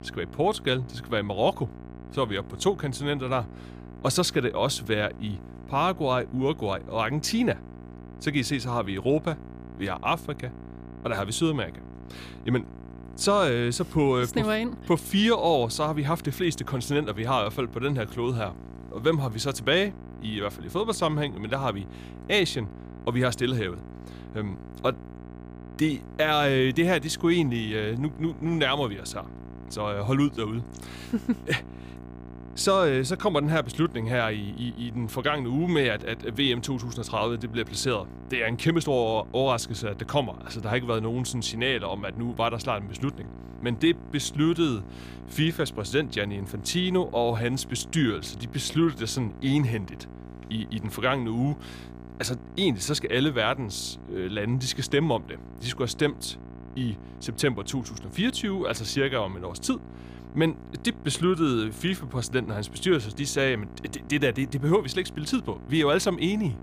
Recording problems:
electrical hum; faint; throughout; 60 Hz, 20 dB below the speech

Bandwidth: 15 kHz